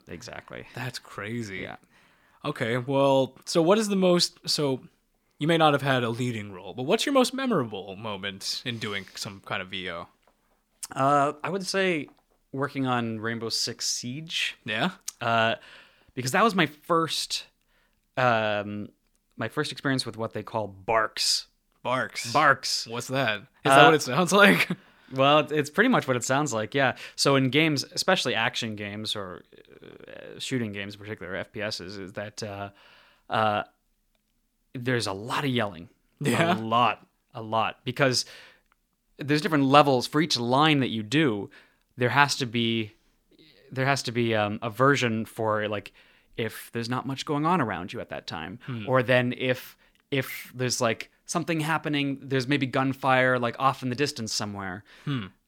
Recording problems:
none

